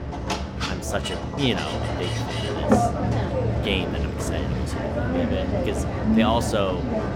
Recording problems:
machinery noise; very loud; throughout; 4 dB above the speech

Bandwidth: 17 kHz